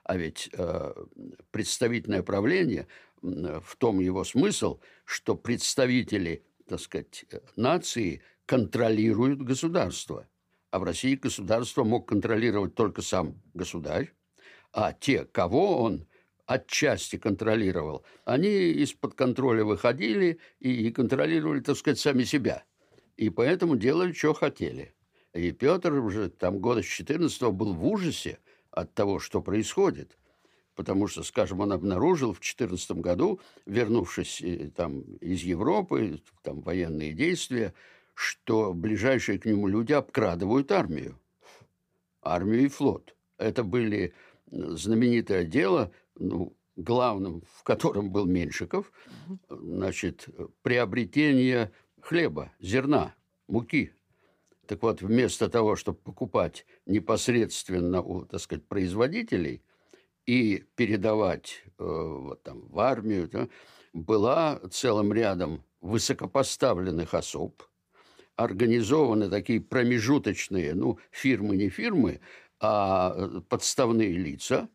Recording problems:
none

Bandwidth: 15 kHz